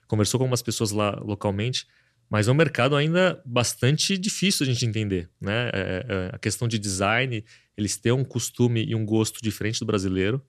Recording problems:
none

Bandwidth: 13.5 kHz